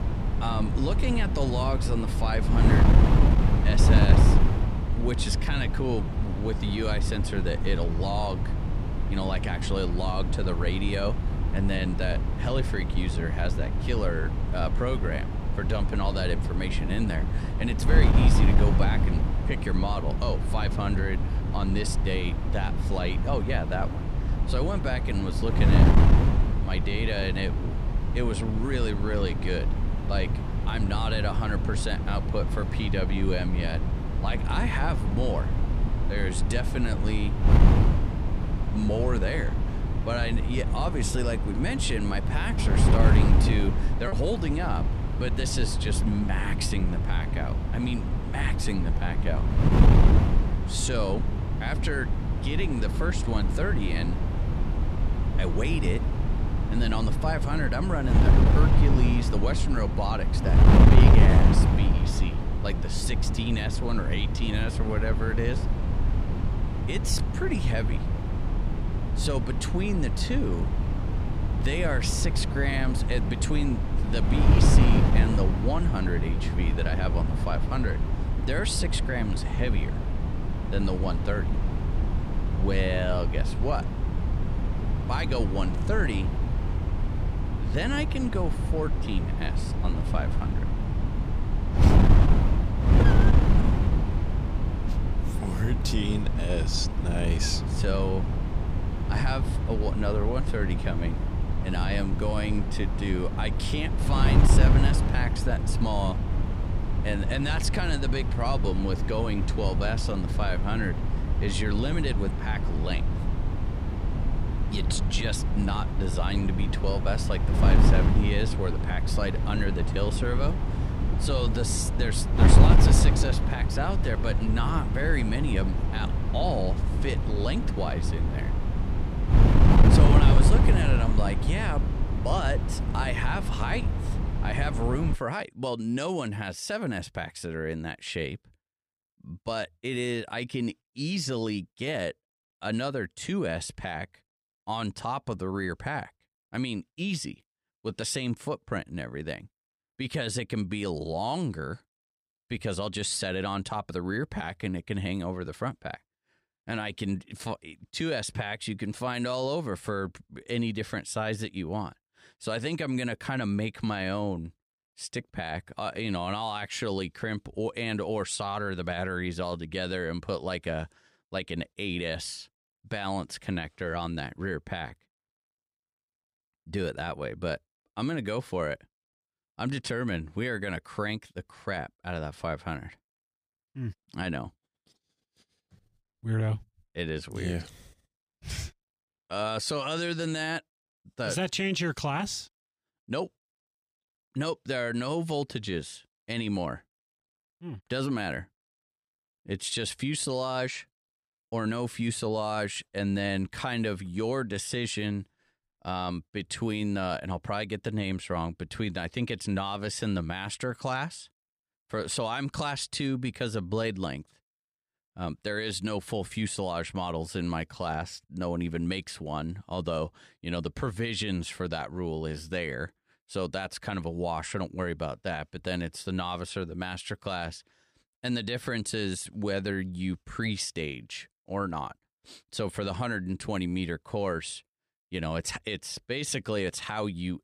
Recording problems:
wind noise on the microphone; heavy; until 2:15; 3 dB below the speech
choppy; occasionally; at 44 s and at 3:21; 1% of the speech affected

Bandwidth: 15 kHz